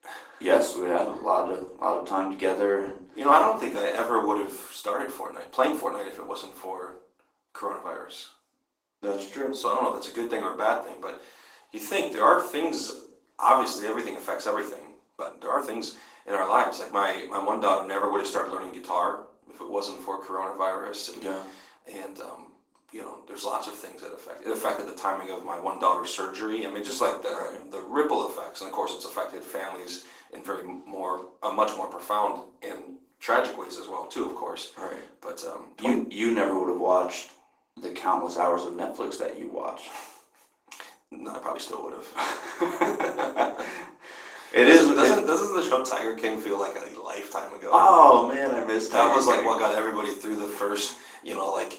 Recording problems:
off-mic speech; far
thin; somewhat; fading below 300 Hz
room echo; slight; dies away in 0.4 s
garbled, watery; slightly; nothing above 16 kHz
uneven, jittery; strongly; from 3 to 42 s

